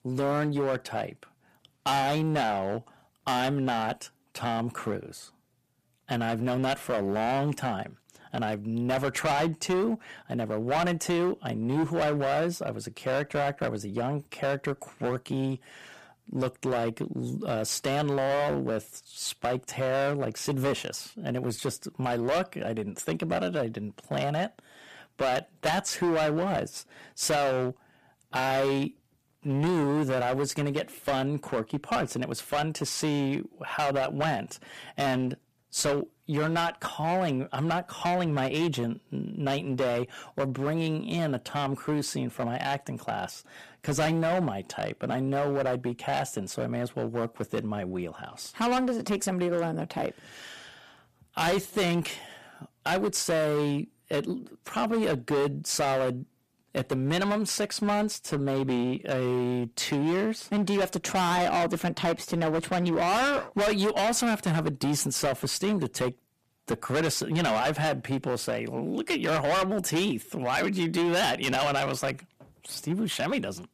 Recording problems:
distortion; heavy; 14% of the sound clipped

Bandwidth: 14.5 kHz